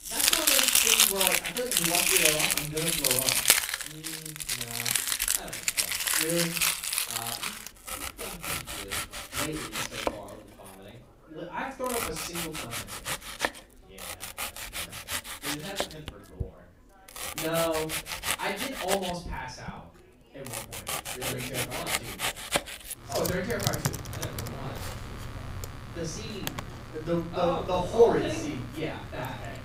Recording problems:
off-mic speech; far
room echo; noticeable; dies away in 0.4 s
household noises; very loud; throughout; 6 dB above the speech
chatter from many people; faint; throughout; 25 dB below the speech

